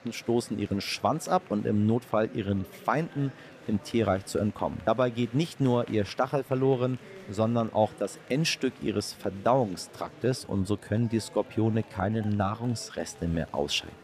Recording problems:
murmuring crowd; faint; throughout; 20 dB below the speech

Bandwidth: 14.5 kHz